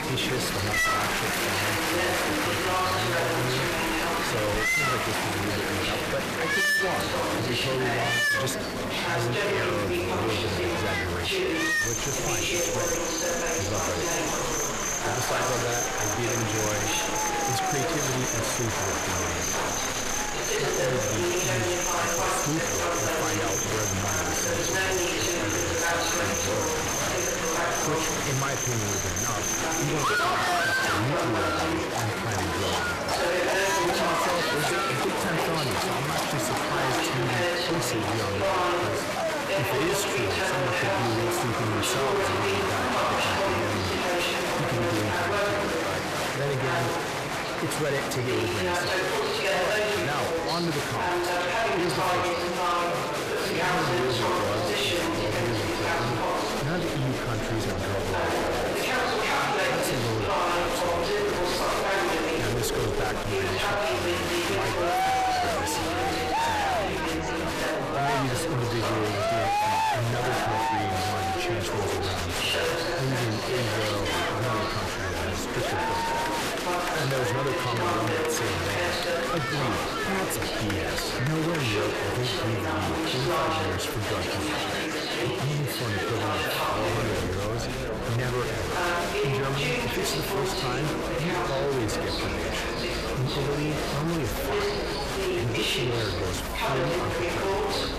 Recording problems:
distortion; heavy; 7 dB below the speech
animal sounds; very loud; throughout; 2 dB above the speech
chatter from many people; very loud; throughout; 4 dB above the speech

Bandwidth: 14.5 kHz